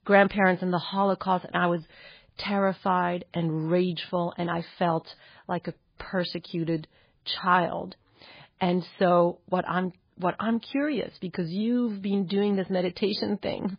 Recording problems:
garbled, watery; badly; nothing above 4 kHz

